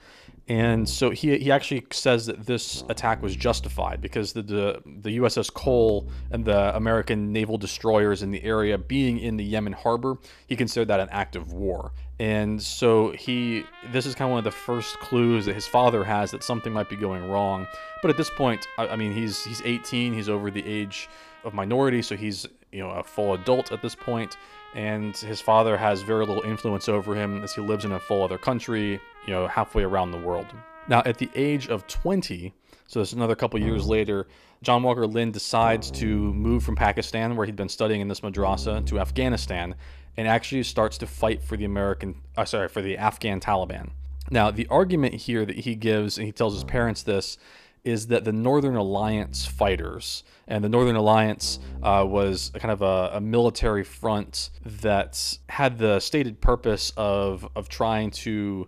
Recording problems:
background music; noticeable; throughout; 15 dB below the speech

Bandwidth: 14.5 kHz